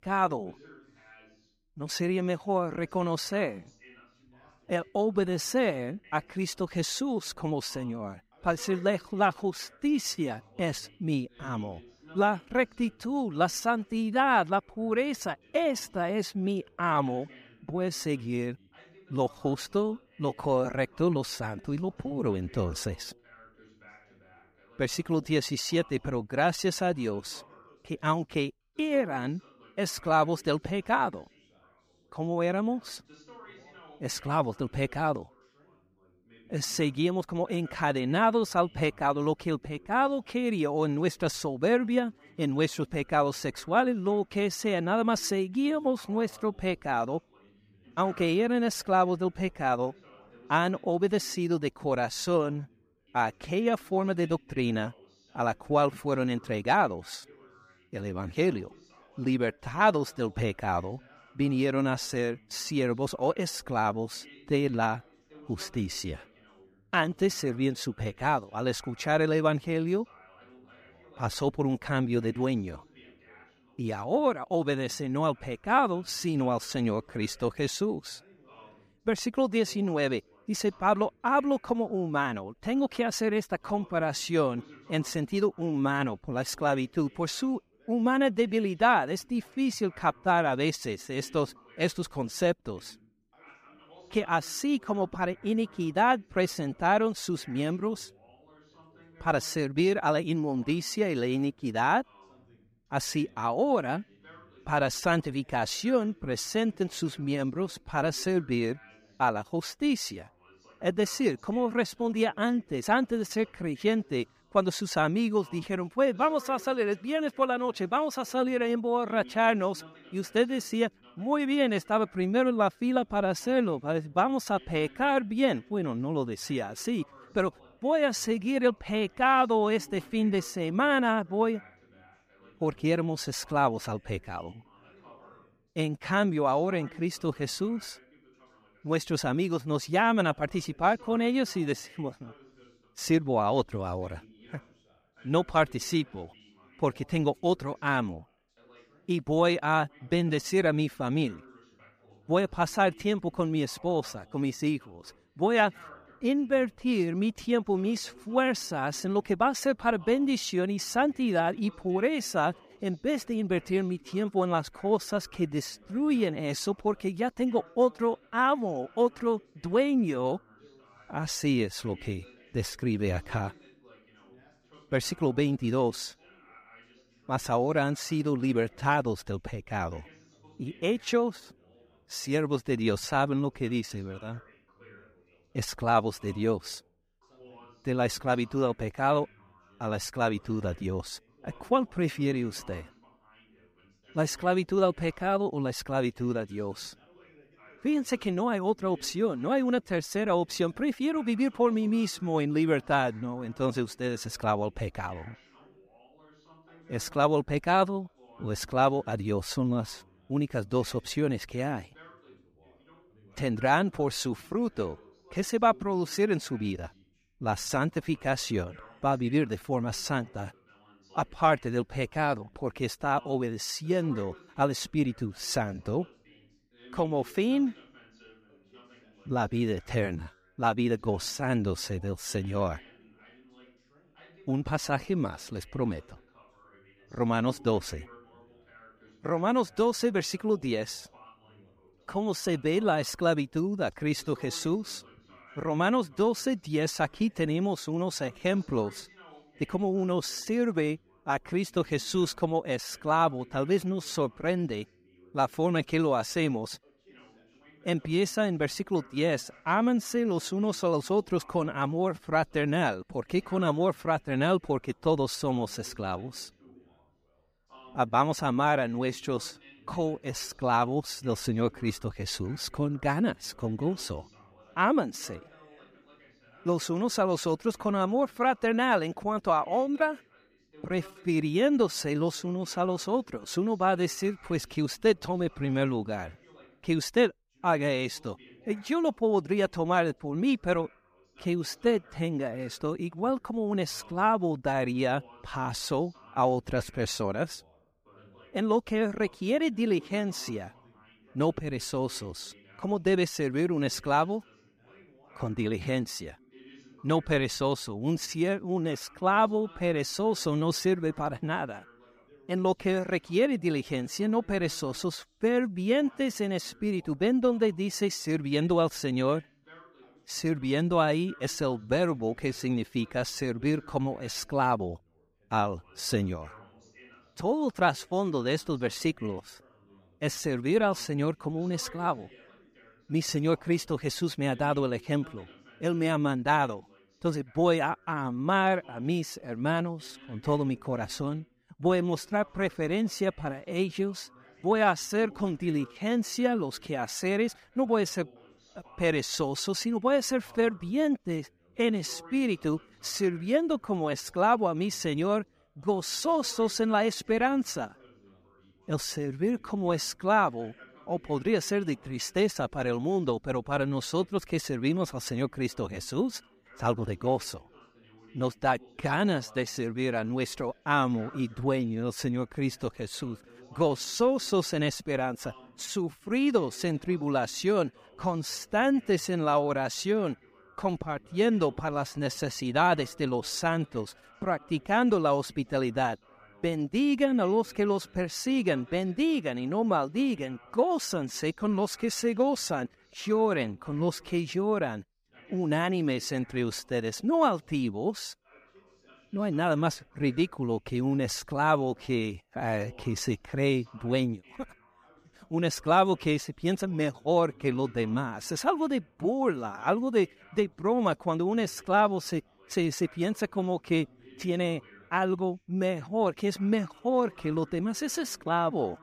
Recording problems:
background chatter; faint; throughout; 2 voices, 25 dB below the speech

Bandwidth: 15 kHz